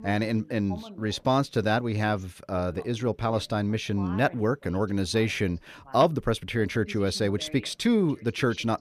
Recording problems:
voice in the background; faint; throughout; 20 dB below the speech

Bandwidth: 14.5 kHz